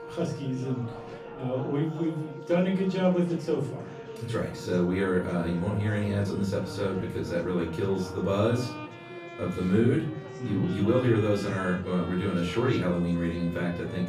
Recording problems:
off-mic speech; far
room echo; slight; dies away in 0.4 s
background music; noticeable; throughout; 15 dB below the speech
chatter from many people; noticeable; throughout; 15 dB below the speech

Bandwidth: 15 kHz